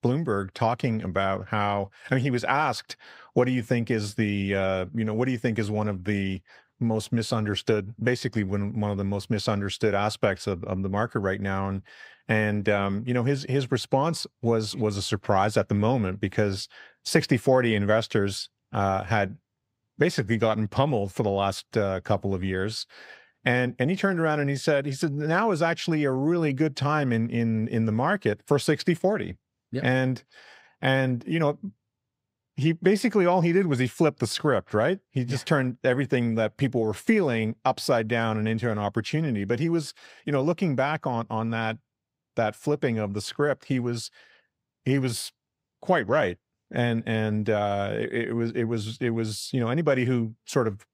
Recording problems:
none

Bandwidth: 15.5 kHz